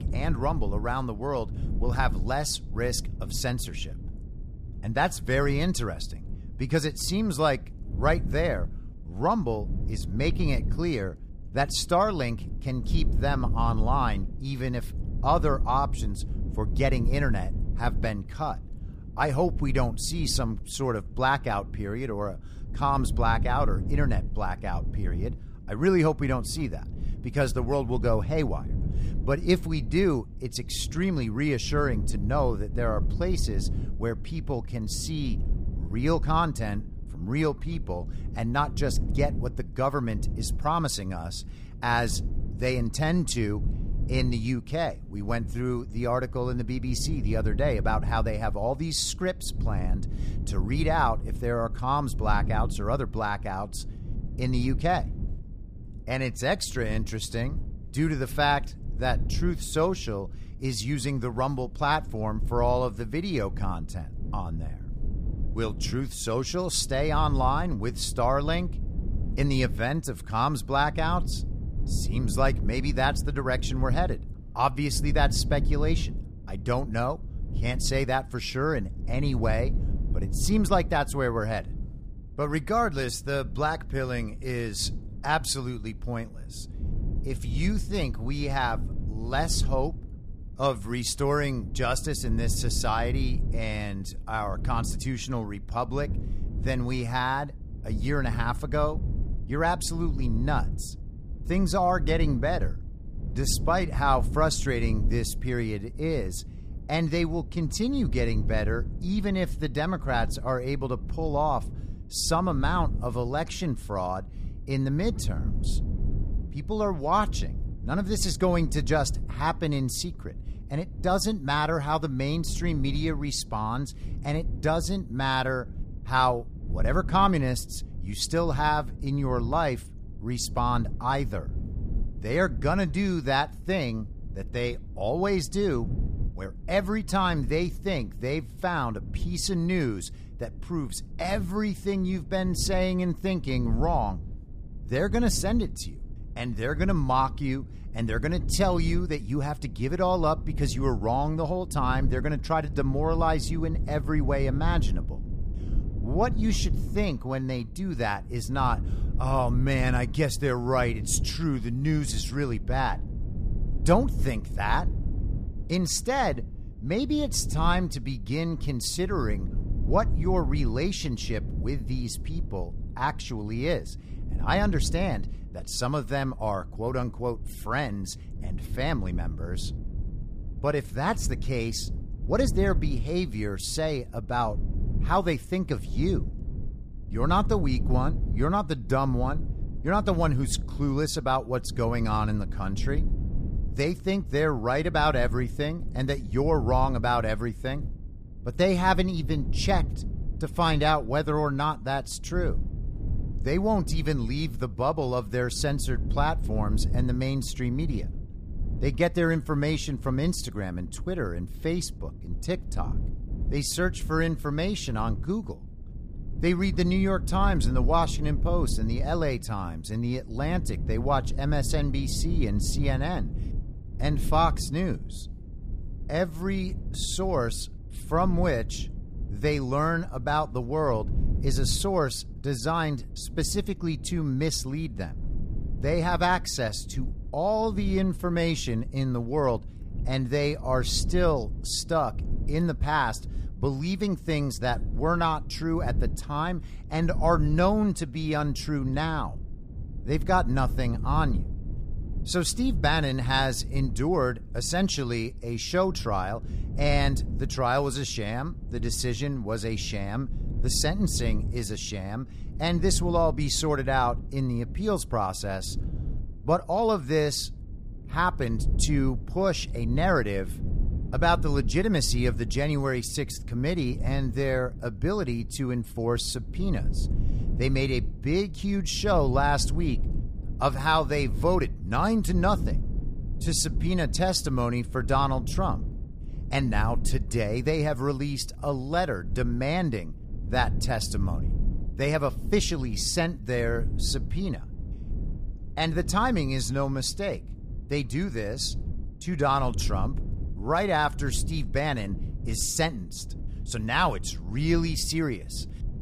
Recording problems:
low rumble; noticeable; throughout; 20 dB below the speech

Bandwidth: 15 kHz